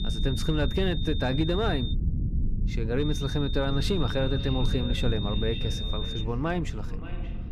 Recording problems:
echo of what is said; noticeable; from 3.5 s on; 580 ms later, 15 dB below the speech
high-pitched whine; loud; until 2 s and from 3 to 6 s; 3.5 kHz, 7 dB below the speech
low rumble; noticeable; throughout; 15 dB below the speech

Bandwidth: 14.5 kHz